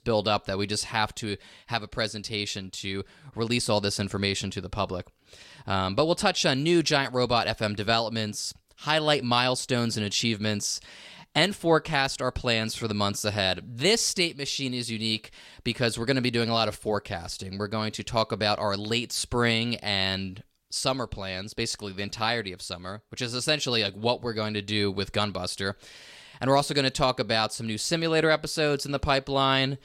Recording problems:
none

